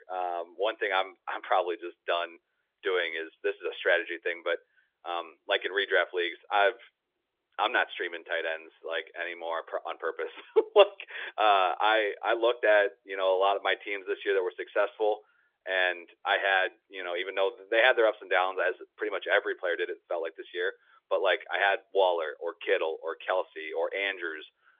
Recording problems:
phone-call audio; nothing above 3.5 kHz

